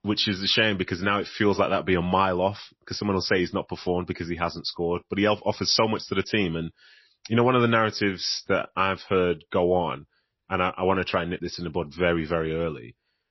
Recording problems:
garbled, watery; slightly; nothing above 5.5 kHz

